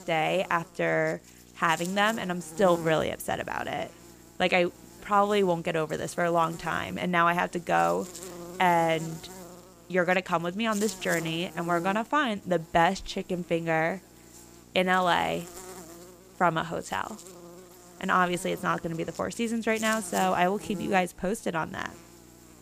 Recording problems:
electrical hum; noticeable; throughout; 60 Hz, 20 dB below the speech

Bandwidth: 15 kHz